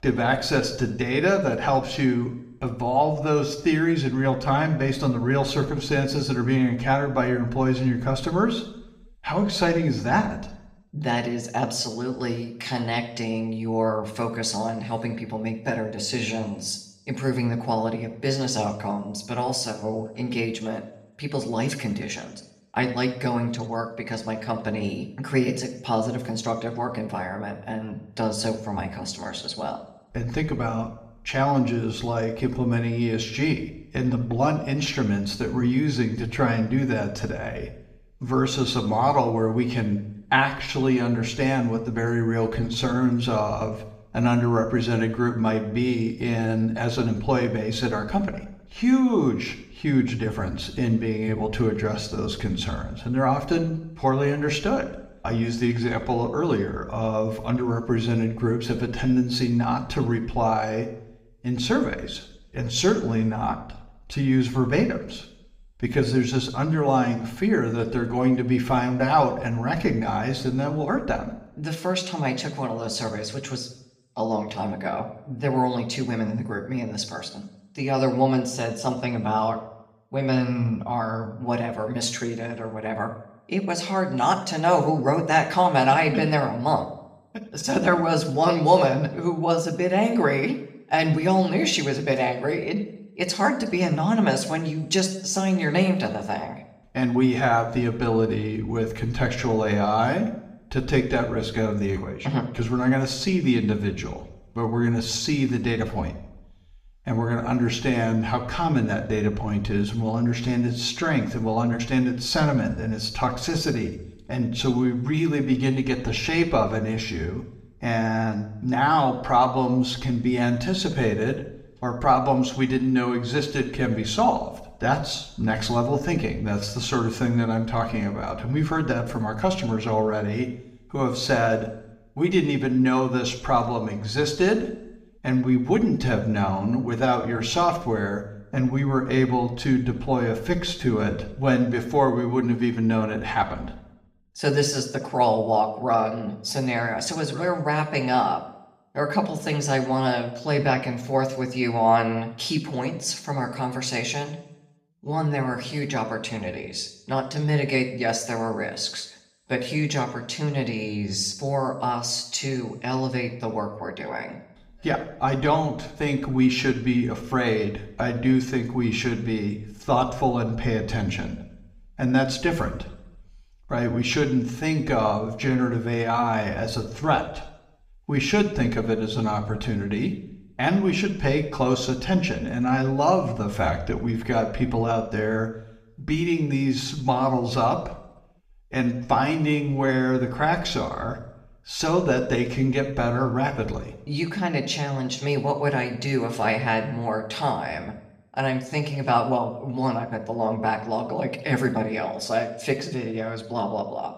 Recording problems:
room echo; slight; dies away in 0.6 s
off-mic speech; somewhat distant

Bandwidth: 15.5 kHz